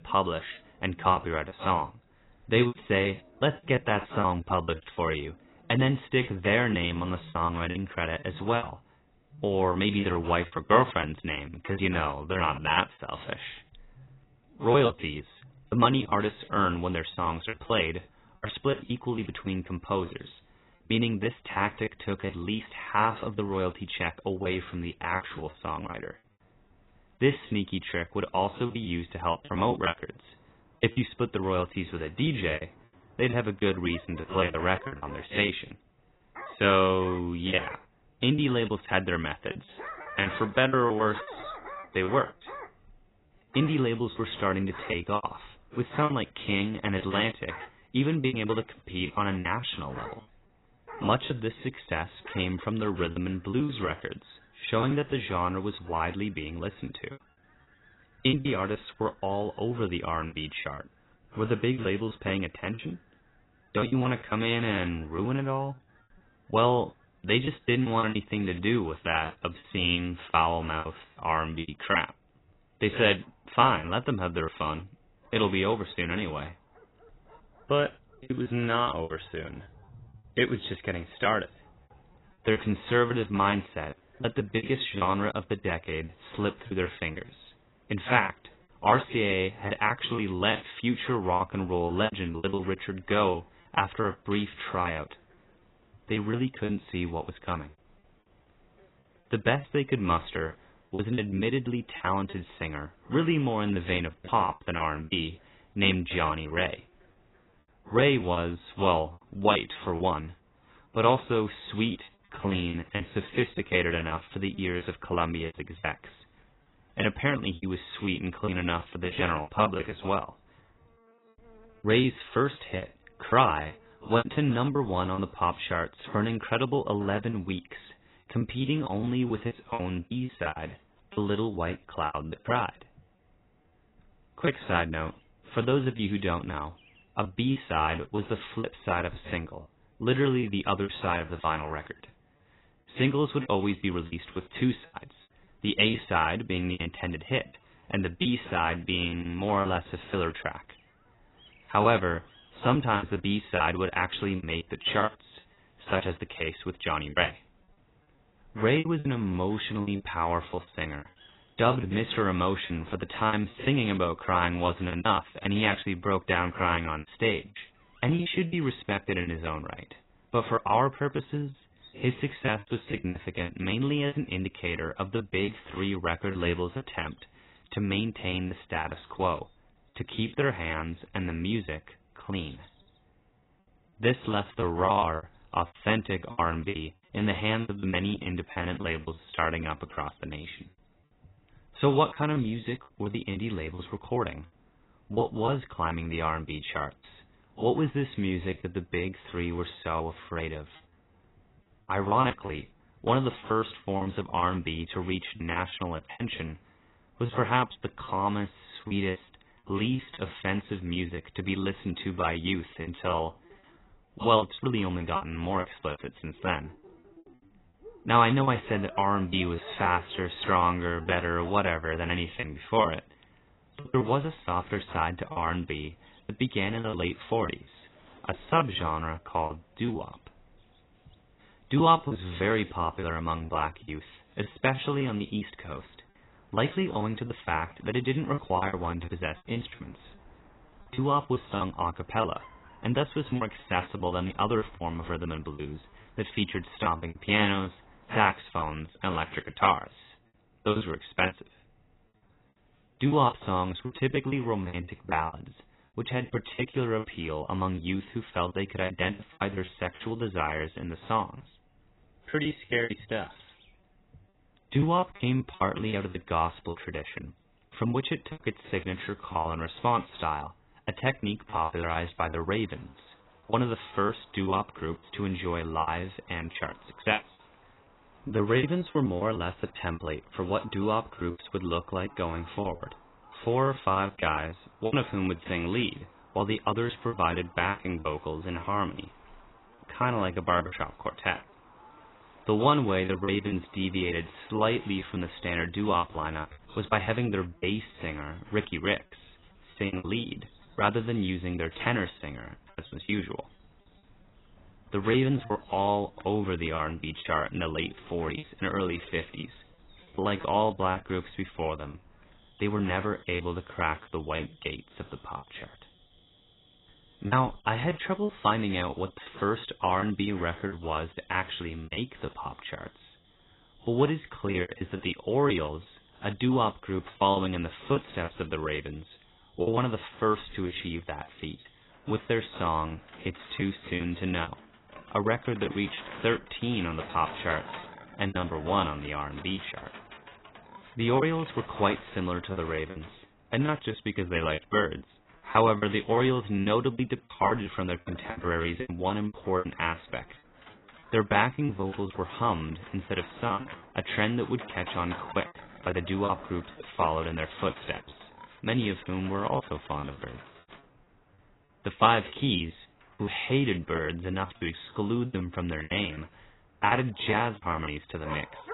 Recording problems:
garbled, watery; badly; nothing above 4 kHz
animal sounds; faint; throughout; 25 dB below the speech
choppy; very; 12% of the speech affected

